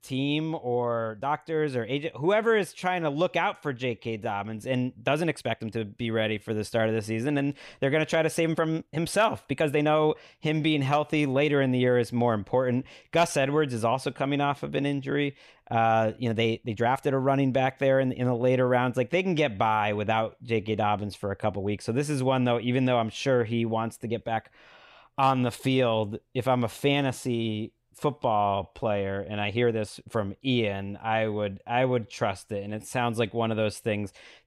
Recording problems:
uneven, jittery; strongly; from 1 to 33 s

